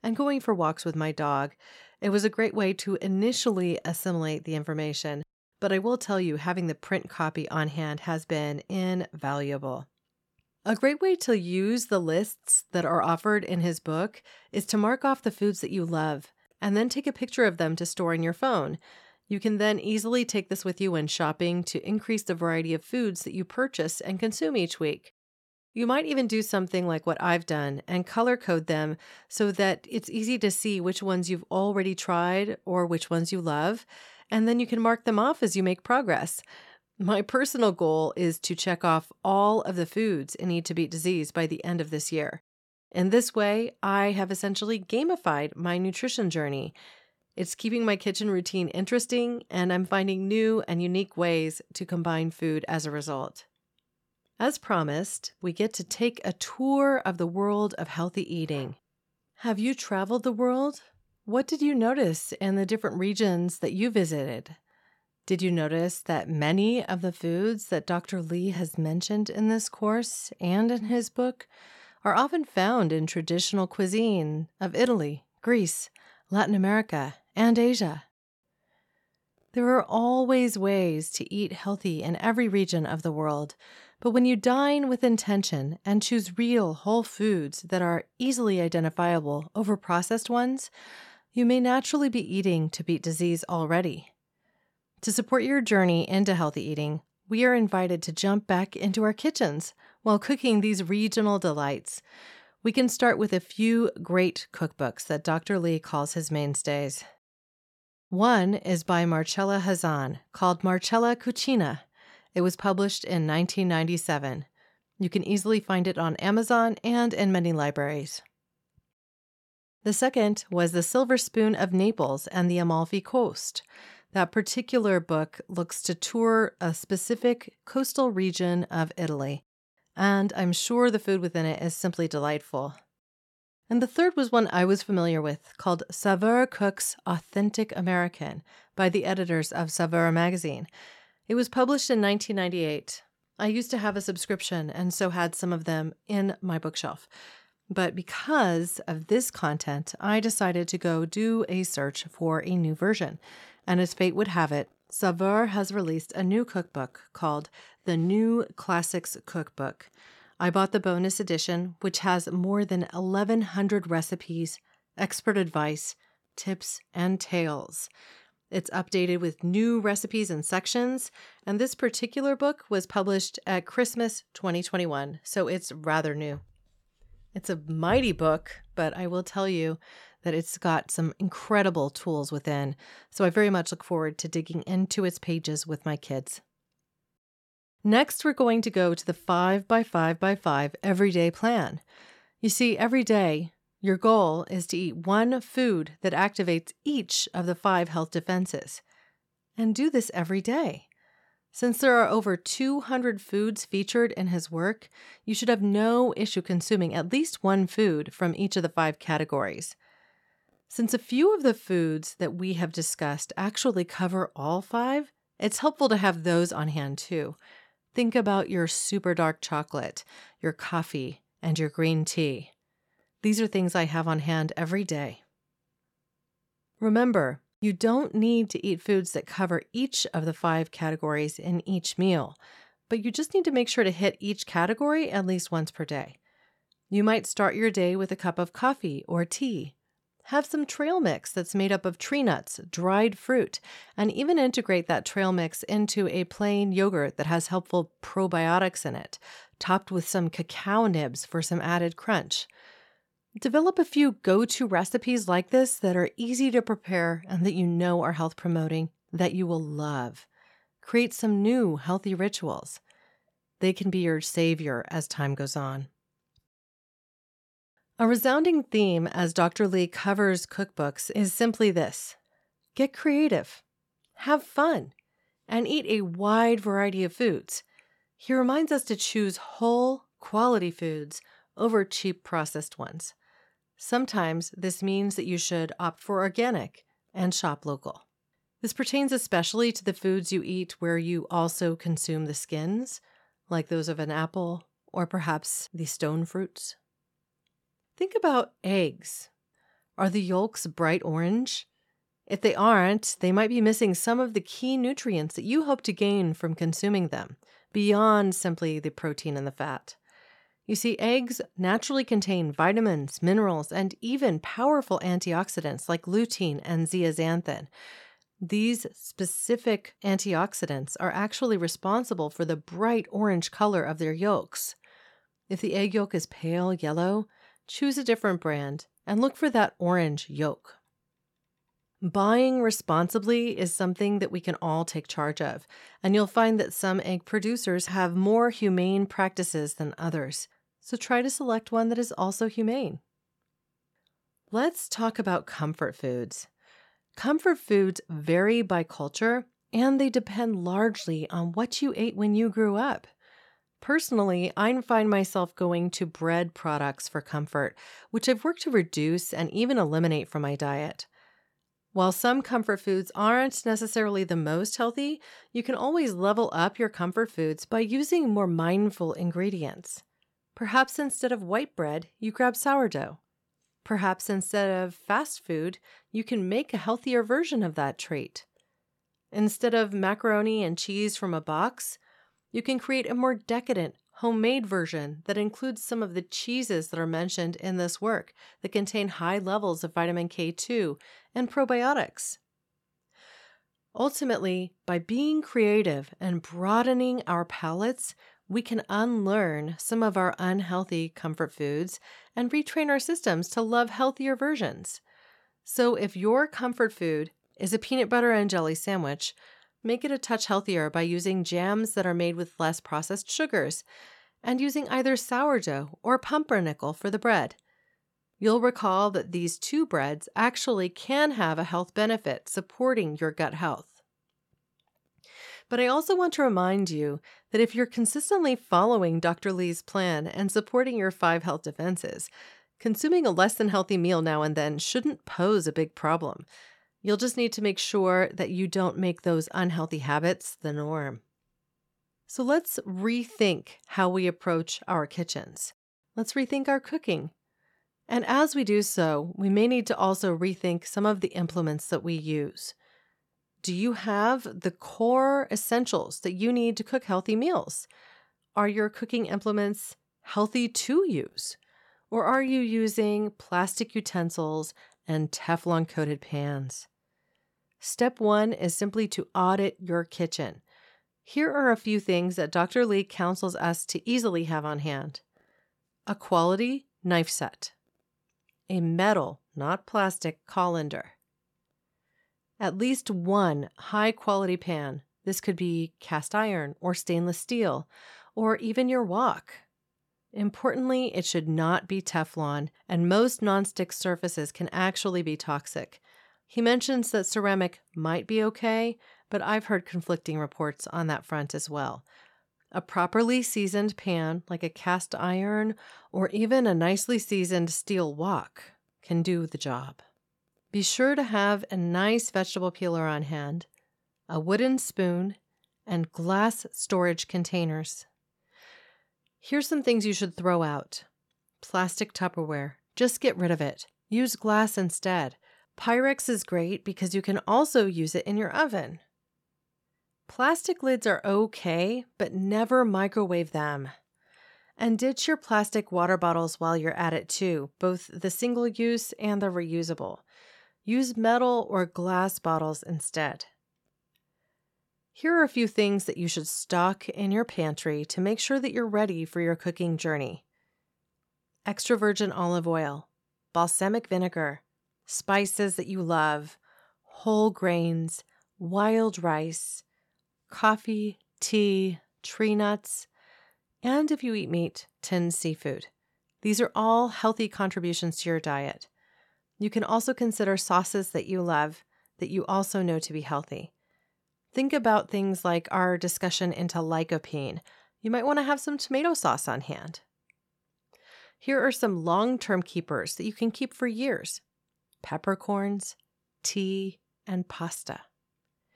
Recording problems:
none

